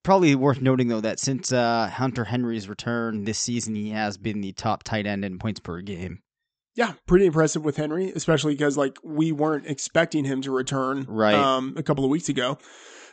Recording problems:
high frequencies cut off; noticeable; nothing above 8 kHz

